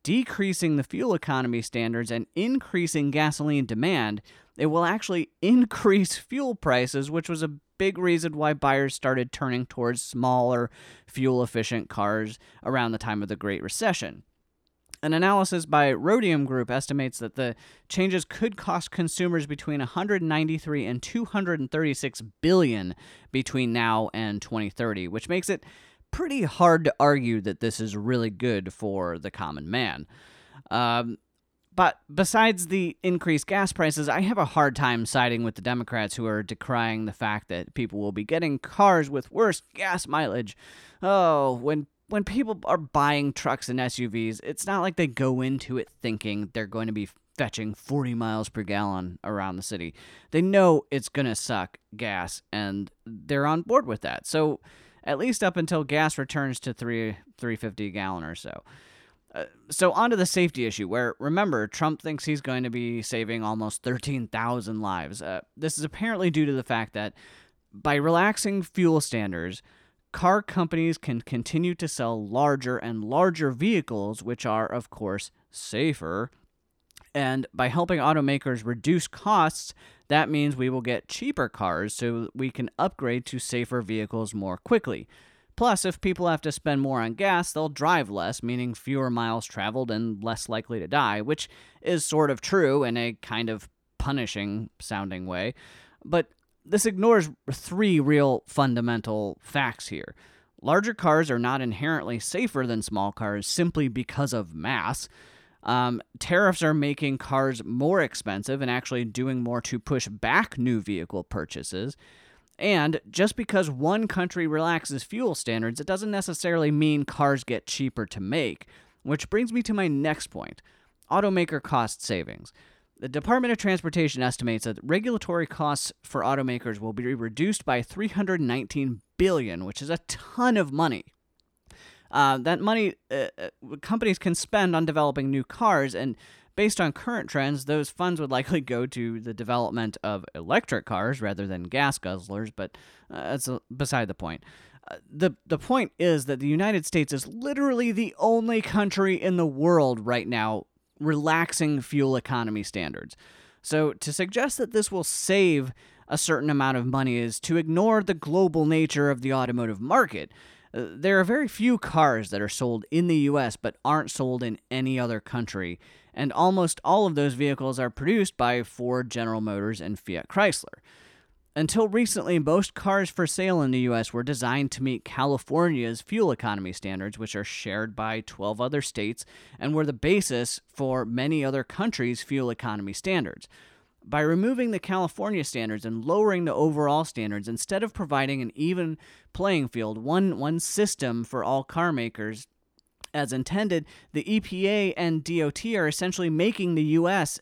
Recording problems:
none

